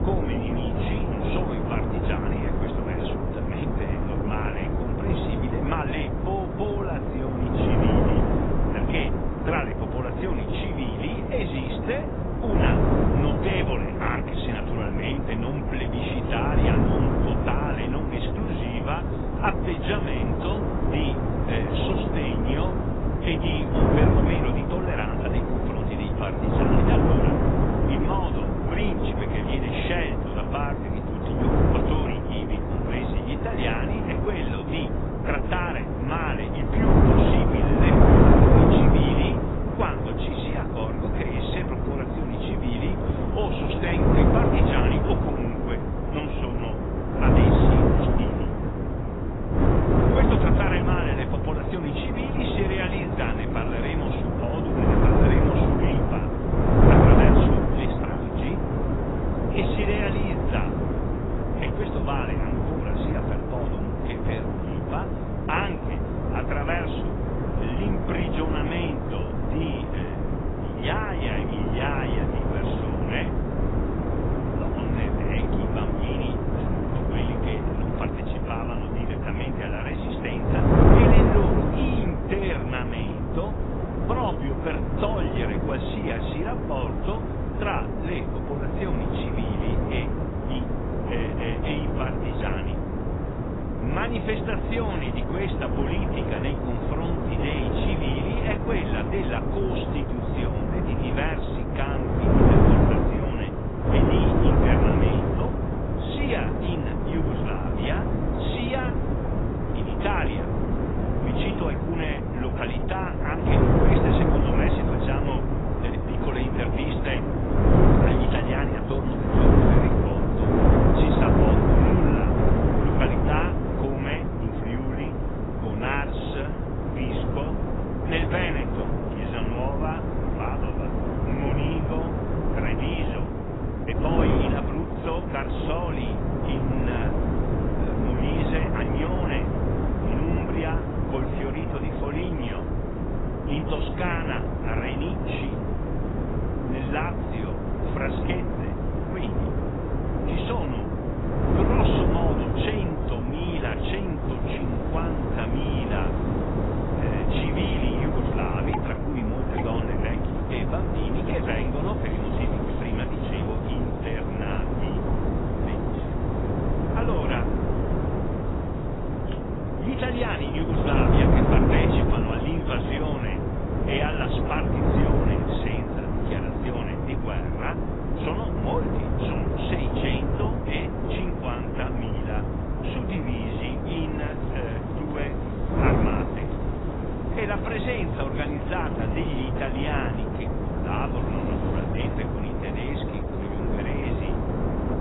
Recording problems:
garbled, watery; badly; nothing above 4 kHz
wind noise on the microphone; heavy; 3 dB above the speech
rain or running water; noticeable; from 2:34 on; 20 dB below the speech

